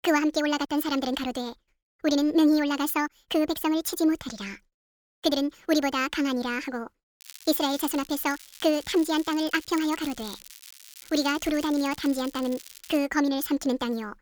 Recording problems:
wrong speed and pitch; too fast and too high; 1.5 times normal speed
crackling; noticeable; from 7 to 13 s; 20 dB below the speech

